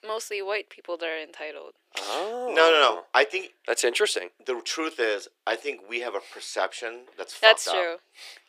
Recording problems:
thin; very; fading below 350 Hz

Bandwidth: 15 kHz